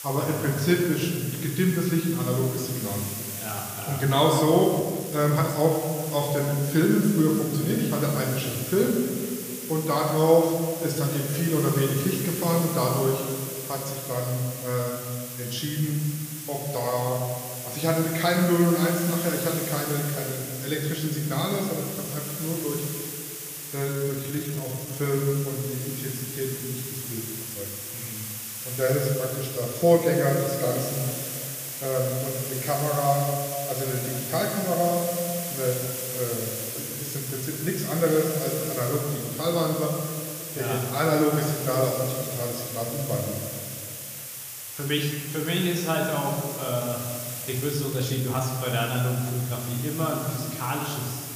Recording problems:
room echo; noticeable; dies away in 1.7 s
off-mic speech; somewhat distant
hiss; loud; throughout; 7 dB below the speech
uneven, jittery; strongly; from 5 to 48 s

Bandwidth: 15 kHz